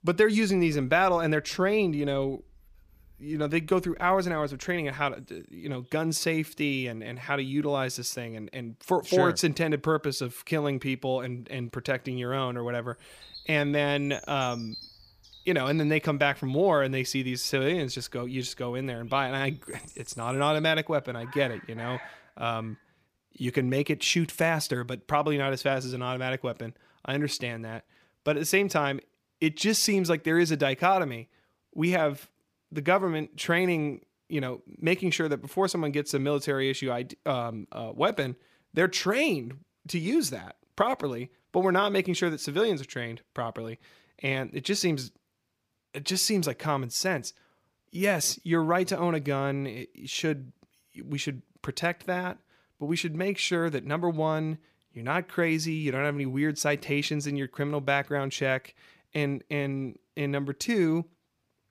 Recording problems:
animal sounds; noticeable; until 22 s; 20 dB below the speech

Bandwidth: 15 kHz